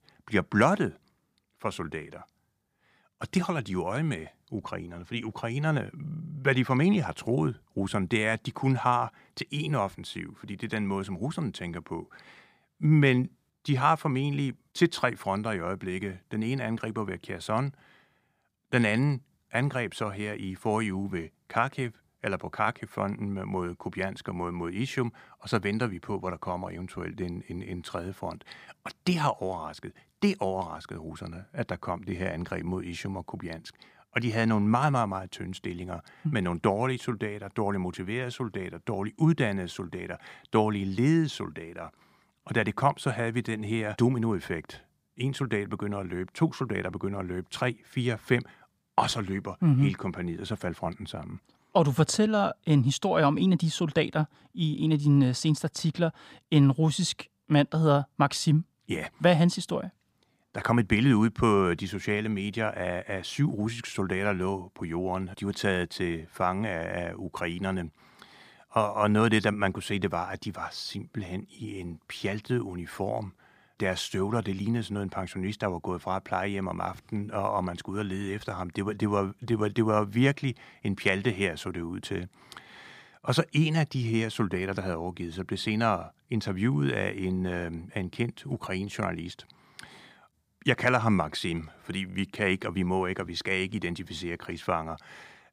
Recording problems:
none

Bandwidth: 15 kHz